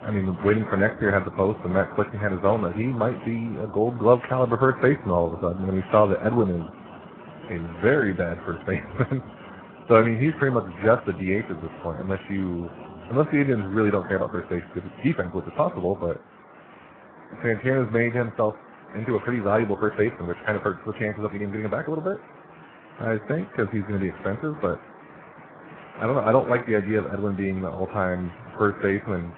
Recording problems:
garbled, watery; badly; nothing above 3.5 kHz
rain or running water; noticeable; throughout; 20 dB below the speech
uneven, jittery; strongly; from 5 to 28 s

